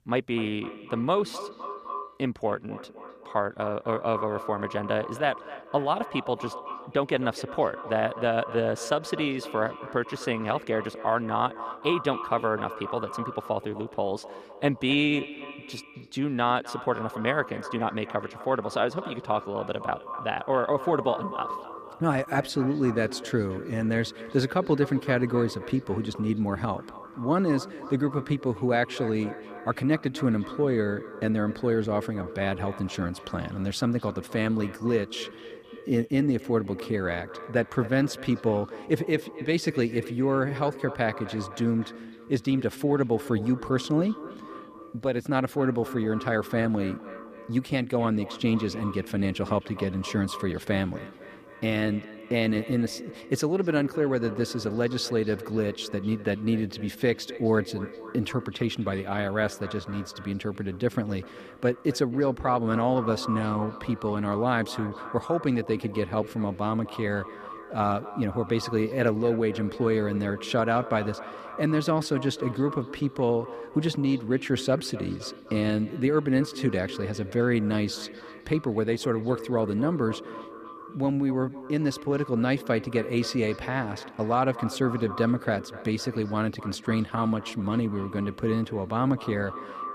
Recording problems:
echo of what is said; noticeable; throughout; 260 ms later, 15 dB below the speech

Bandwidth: 14.5 kHz